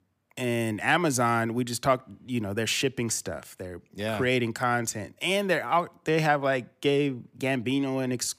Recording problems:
none

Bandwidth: 15 kHz